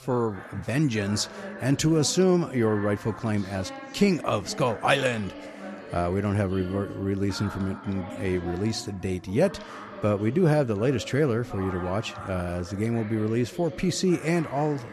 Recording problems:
background chatter; noticeable; throughout; 2 voices, 15 dB below the speech

